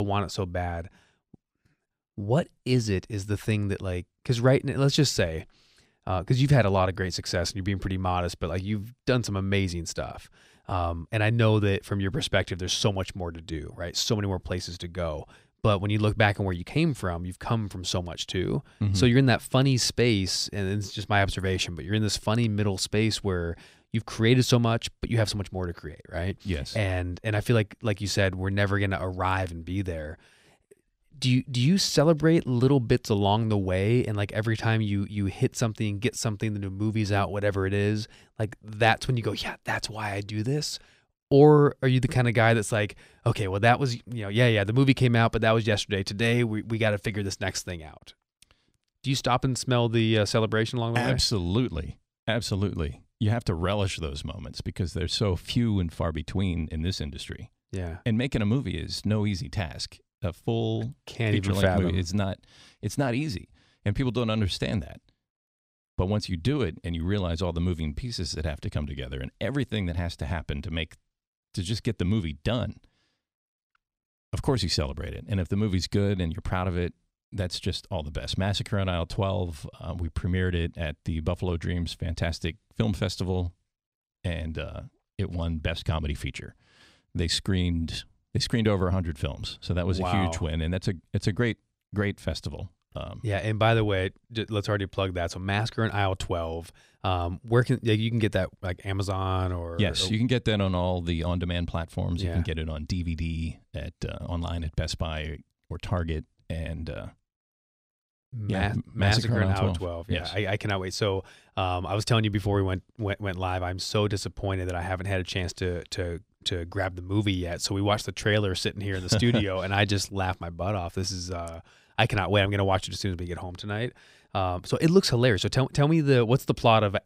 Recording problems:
abrupt cut into speech; at the start

